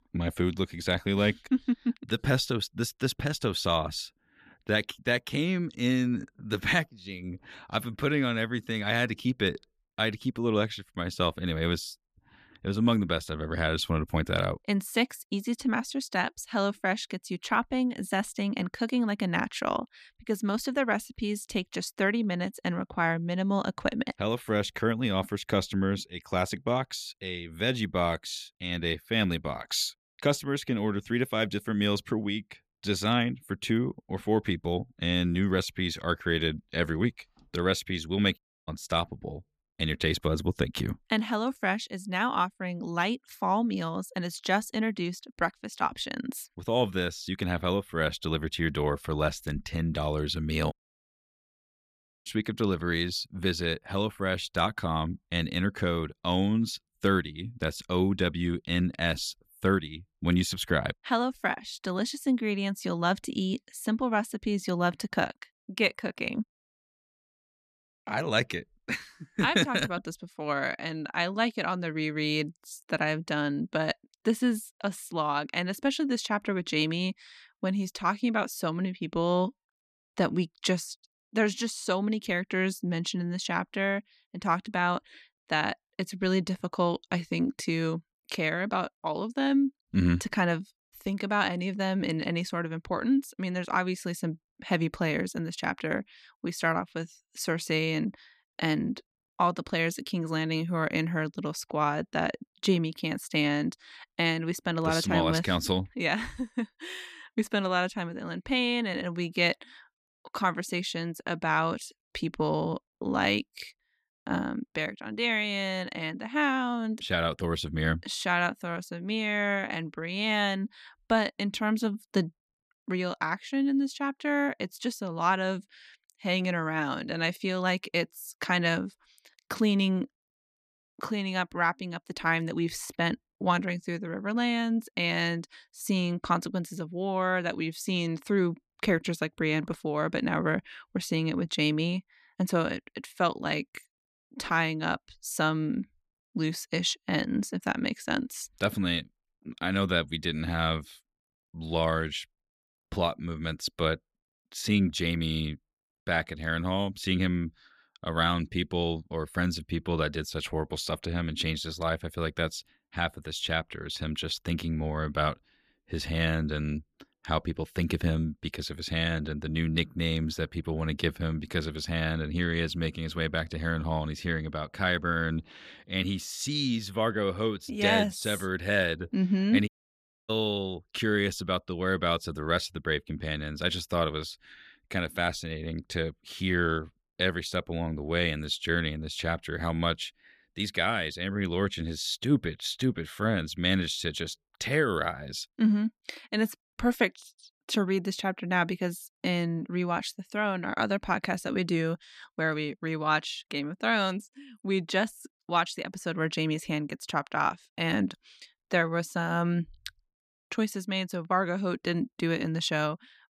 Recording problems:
audio cutting out; at 38 s, at 51 s for 1.5 s and at 3:00 for 0.5 s

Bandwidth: 14.5 kHz